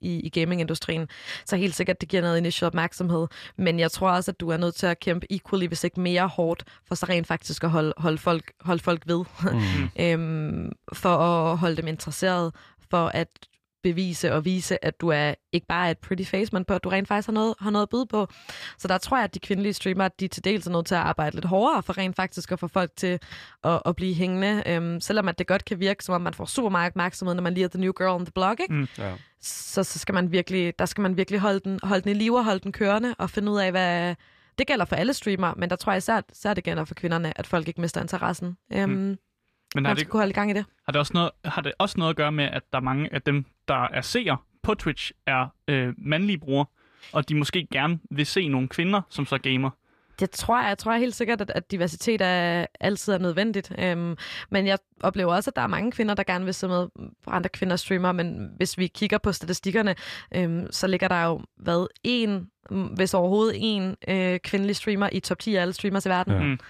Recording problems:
none

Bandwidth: 14.5 kHz